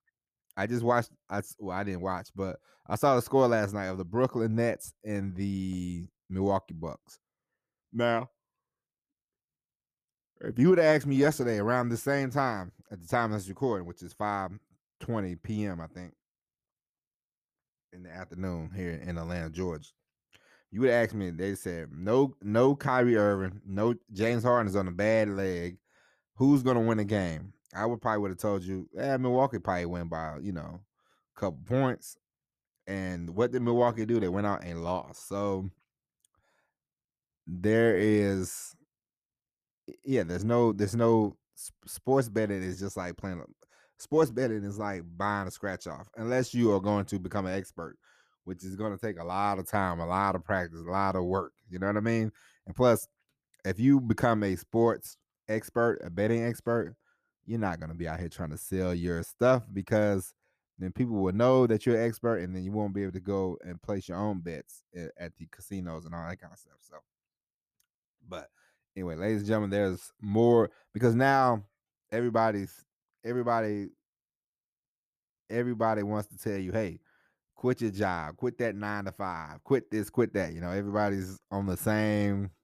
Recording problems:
none

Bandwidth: 14.5 kHz